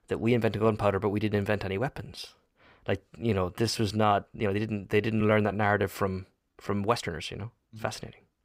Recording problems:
uneven, jittery; strongly; from 2 to 8 s

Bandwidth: 15.5 kHz